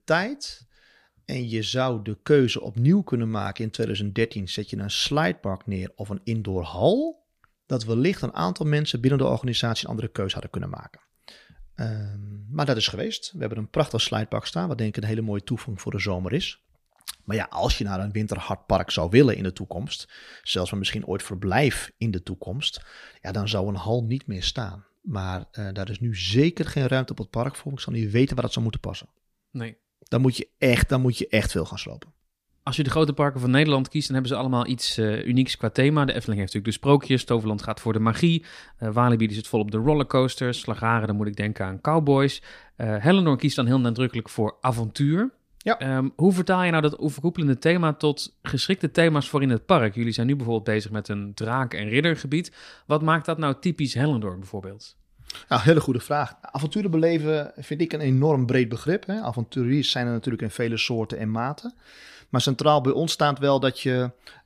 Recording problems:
none

